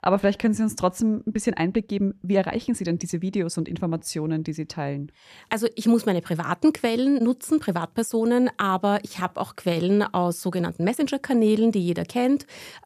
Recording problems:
uneven, jittery; strongly; from 1.5 to 11 s

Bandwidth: 14.5 kHz